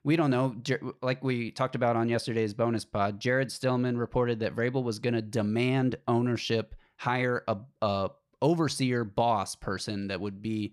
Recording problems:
none

